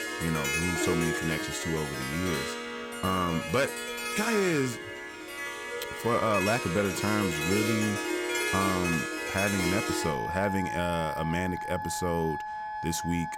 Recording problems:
background music; loud; throughout; 2 dB below the speech

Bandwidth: 16.5 kHz